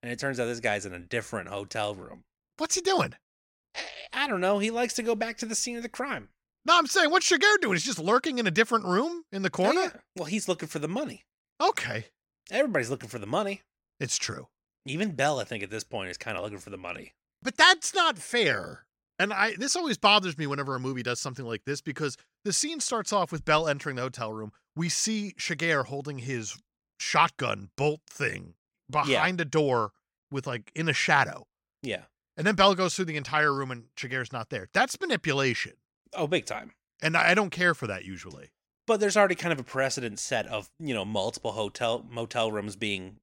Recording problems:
none

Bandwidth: 16.5 kHz